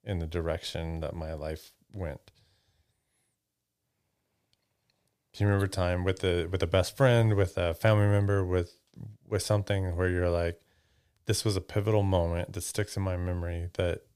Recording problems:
none

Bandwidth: 15 kHz